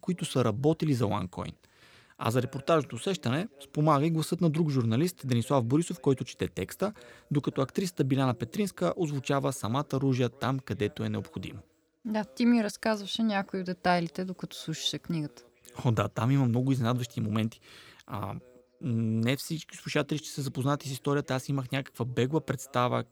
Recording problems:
voice in the background; faint; throughout; 30 dB below the speech

